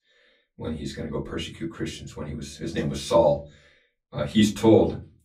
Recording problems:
off-mic speech; far
room echo; very slight; dies away in 0.3 s

